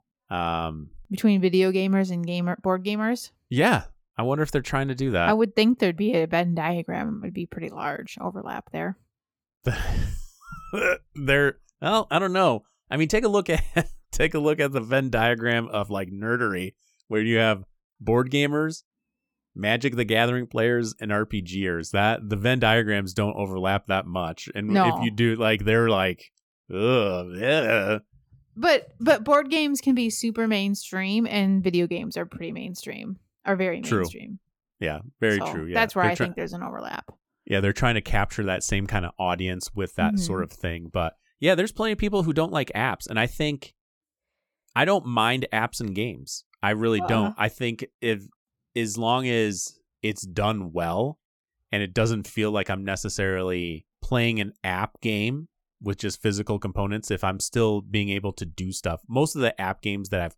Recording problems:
none

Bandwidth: 18 kHz